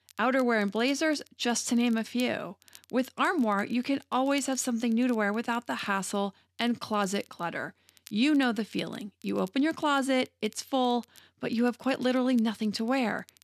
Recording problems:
crackle, like an old record; faint; 25 dB below the speech

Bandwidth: 14 kHz